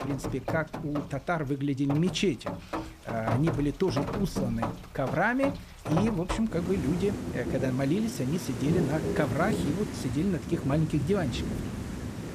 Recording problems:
rain or running water; loud; throughout; 5 dB below the speech

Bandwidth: 14.5 kHz